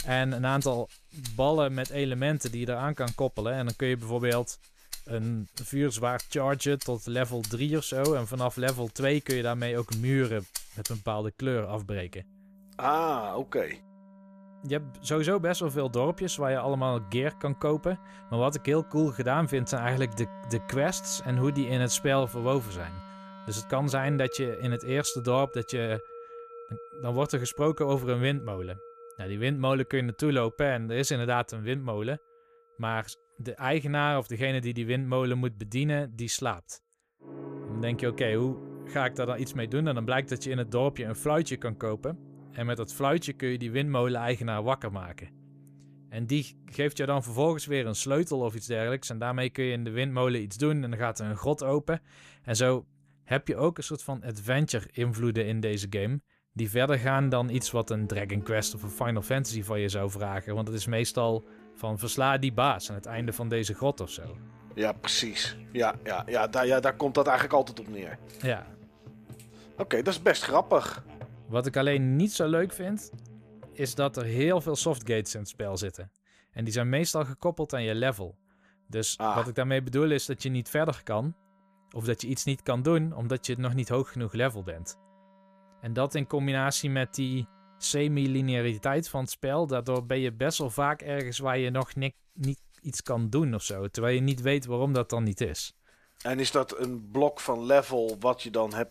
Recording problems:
background music; noticeable; throughout; 20 dB below the speech

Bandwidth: 14.5 kHz